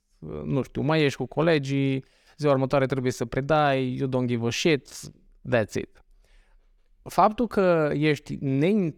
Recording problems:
none

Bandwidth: 18 kHz